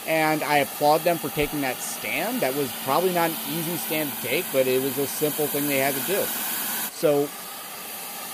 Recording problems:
hiss; loud; throughout; 4 dB below the speech

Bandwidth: 15.5 kHz